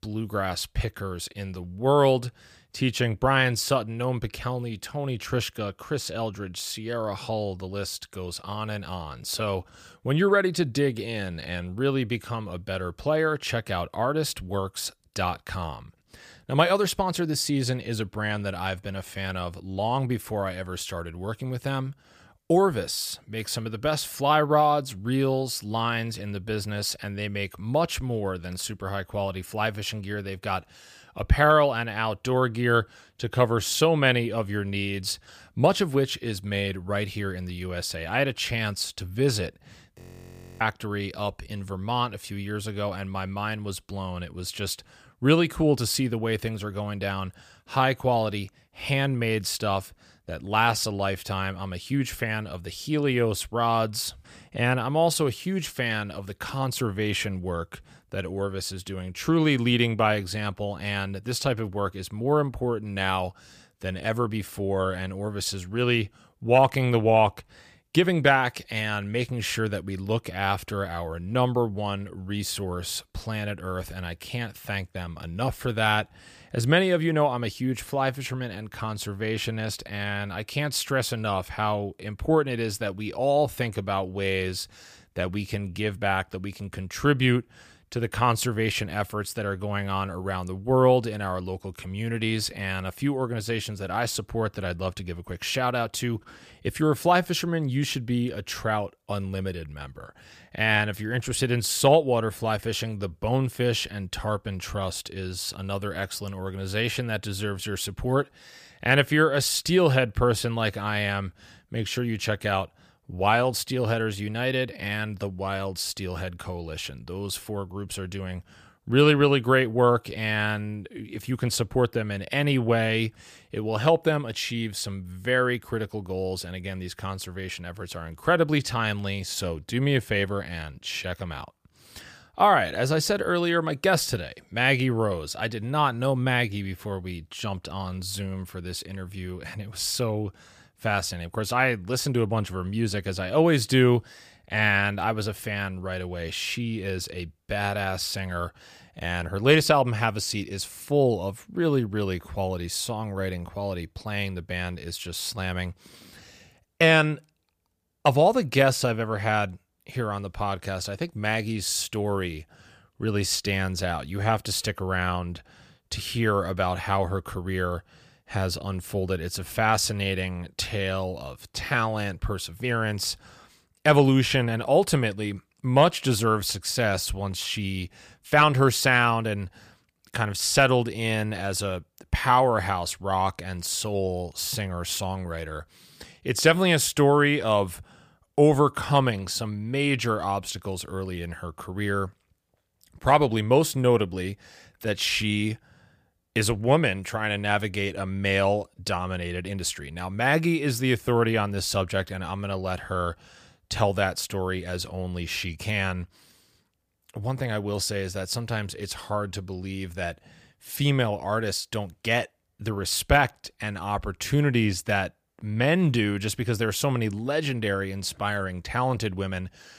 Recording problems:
audio freezing; at 40 s for 0.5 s

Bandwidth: 15 kHz